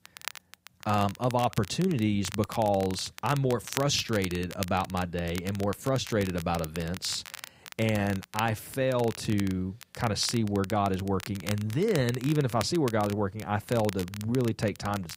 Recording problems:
crackle, like an old record; noticeable; 15 dB below the speech

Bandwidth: 15.5 kHz